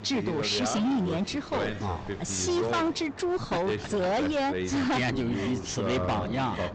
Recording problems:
distortion; heavy; 21% of the sound clipped
high frequencies cut off; noticeable; nothing above 8 kHz
voice in the background; loud; throughout; 5 dB below the speech
rain or running water; noticeable; throughout; 15 dB below the speech

